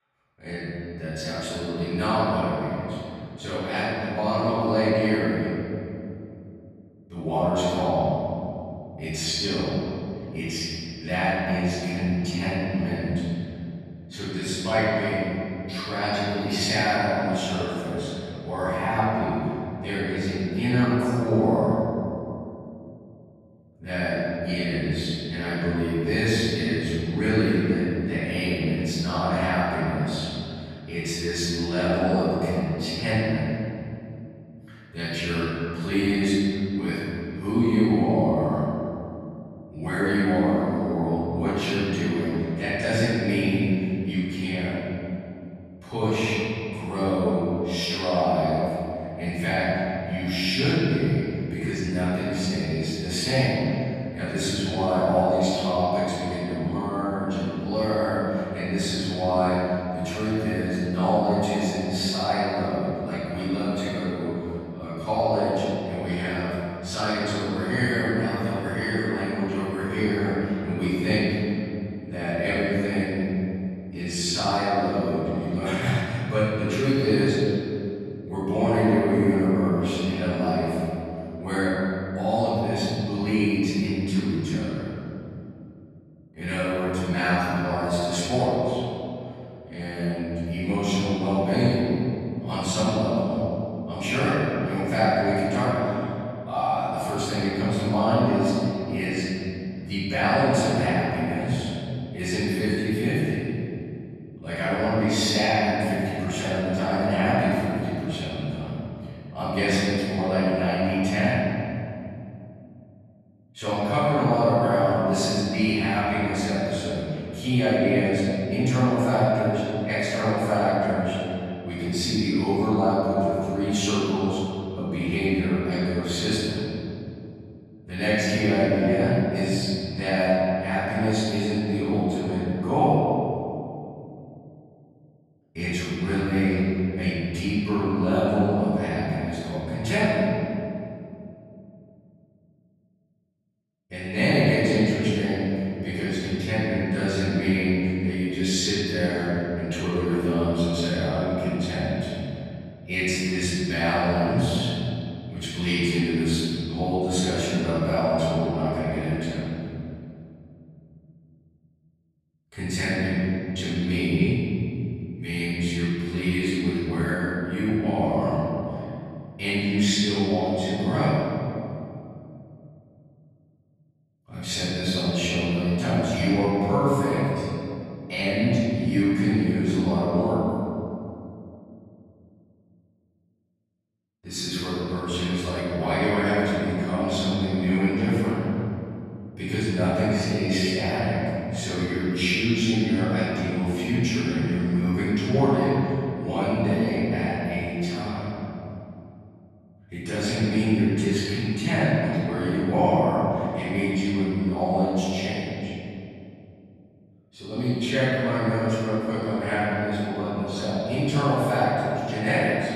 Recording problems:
room echo; strong; dies away in 2.7 s
off-mic speech; far

